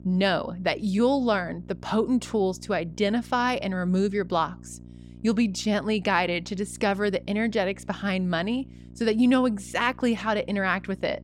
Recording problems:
electrical hum; faint; throughout; 60 Hz, 25 dB below the speech

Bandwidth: 16 kHz